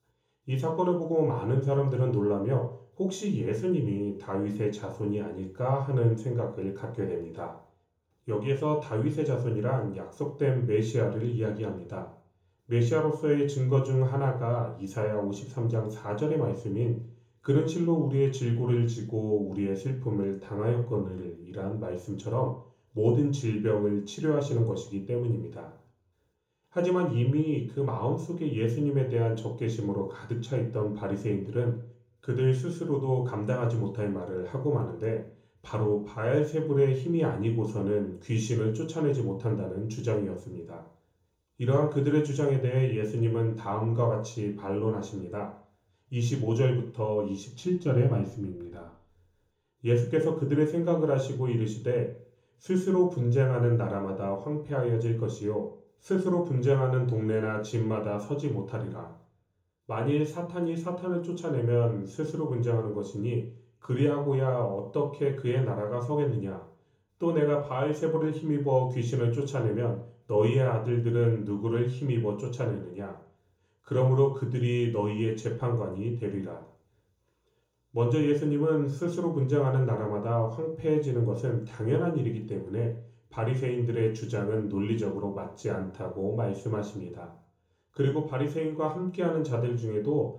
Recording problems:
off-mic speech; far
room echo; noticeable; dies away in 1 s

